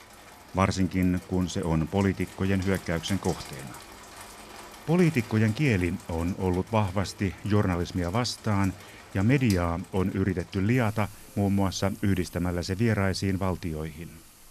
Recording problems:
rain or running water; noticeable; throughout; 20 dB below the speech

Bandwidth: 14.5 kHz